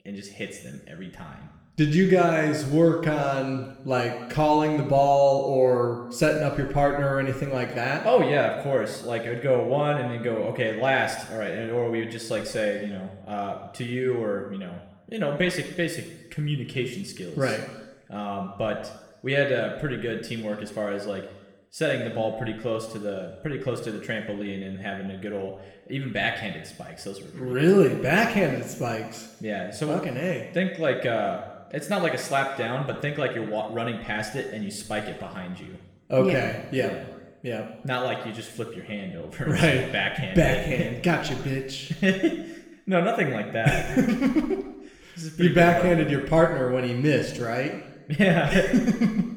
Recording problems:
room echo; noticeable; dies away in 1 s
off-mic speech; somewhat distant

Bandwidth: 18.5 kHz